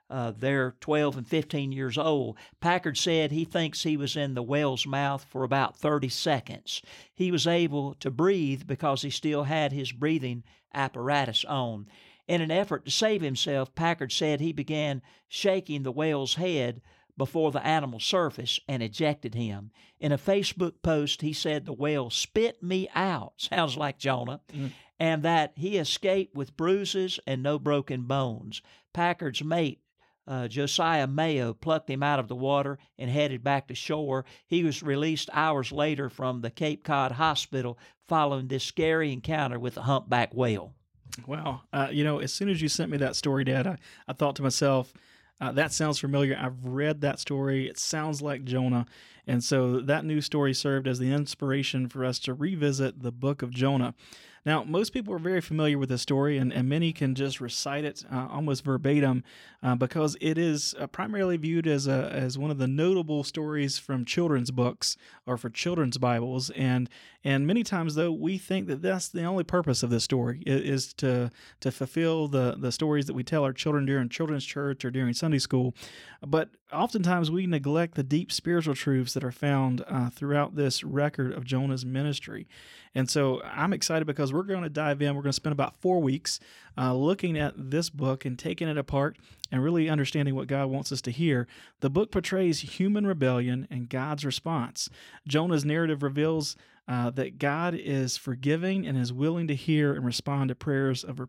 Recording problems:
none

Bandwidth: 16.5 kHz